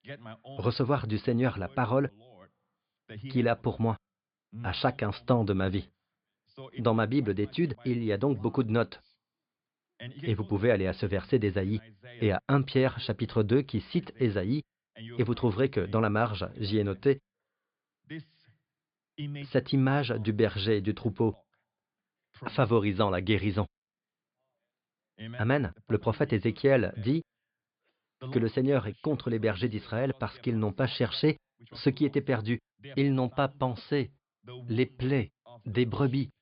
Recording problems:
high frequencies cut off; severe; nothing above 5 kHz

